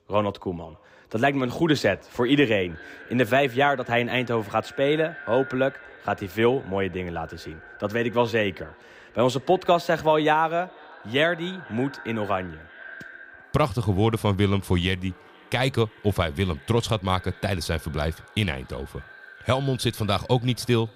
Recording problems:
echo of what is said; faint; throughout; 500 ms later, 20 dB below the speech

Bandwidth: 15.5 kHz